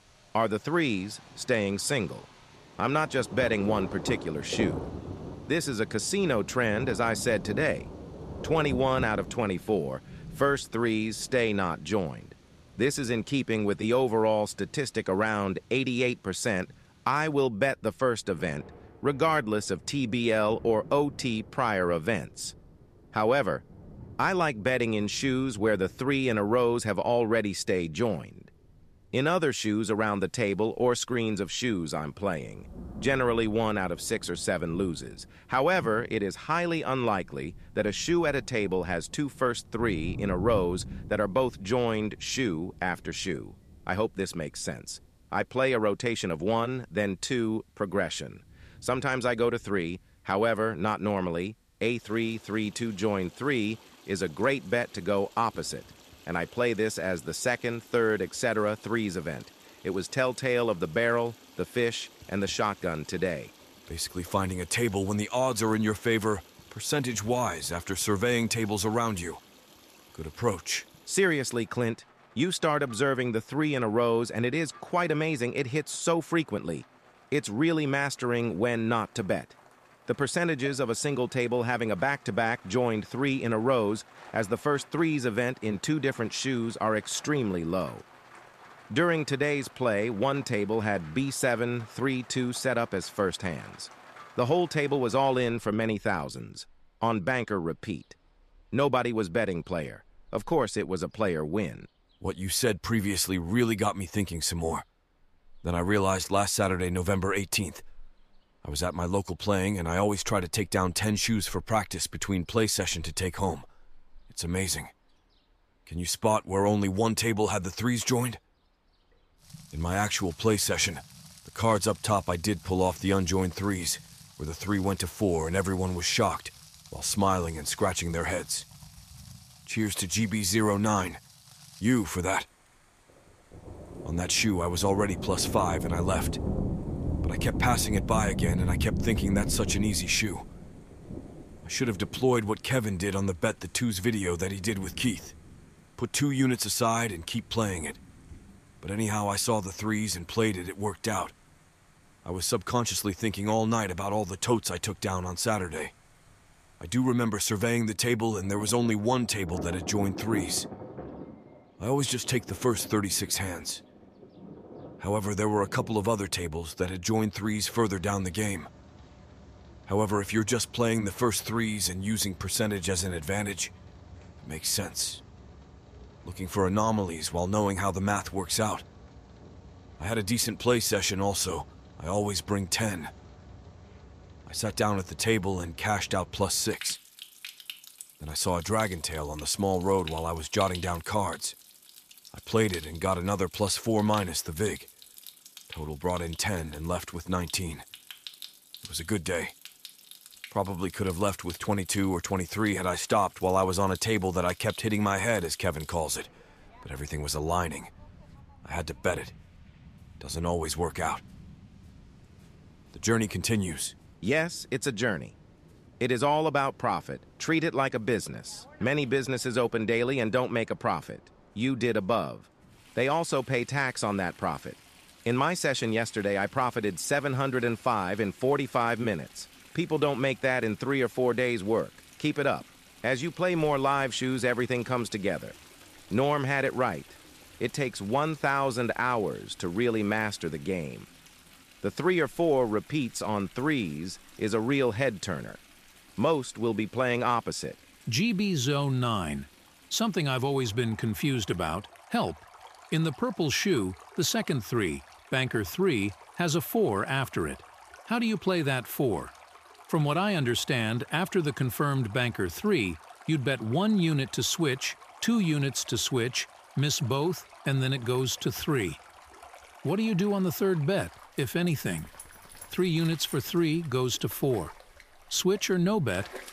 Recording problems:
rain or running water; noticeable; throughout; 15 dB below the speech

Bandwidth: 14.5 kHz